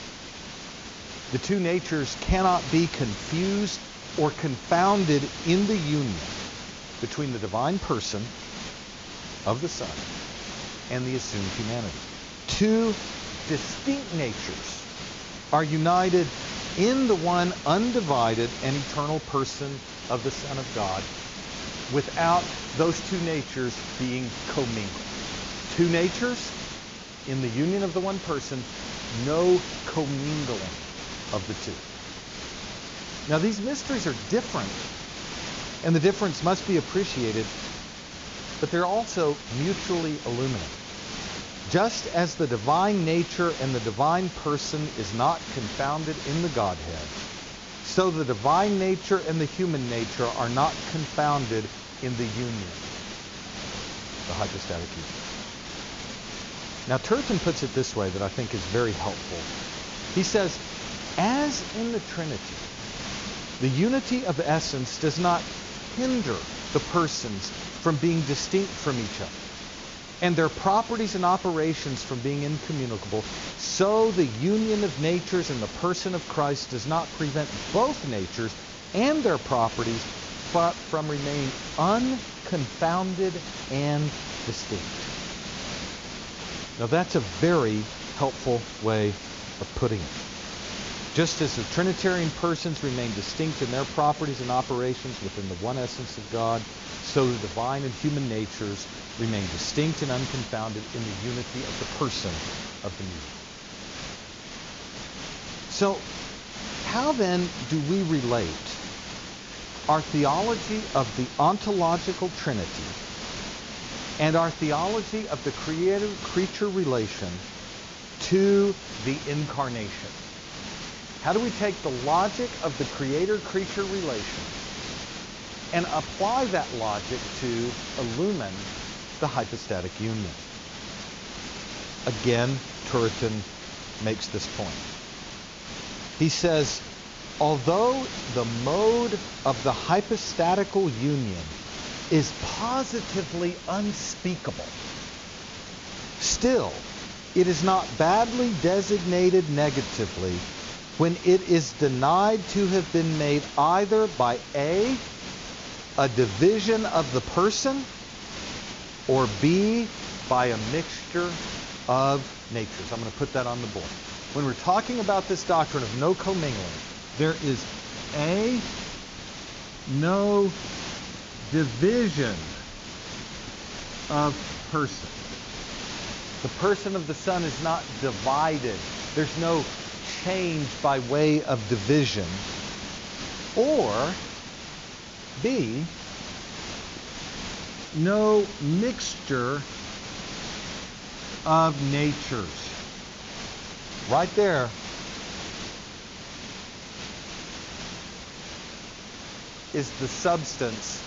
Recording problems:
high frequencies cut off; noticeable; nothing above 7 kHz
hiss; loud; throughout; 9 dB below the speech

